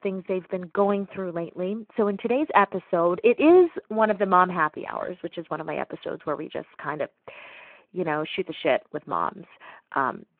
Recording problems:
phone-call audio

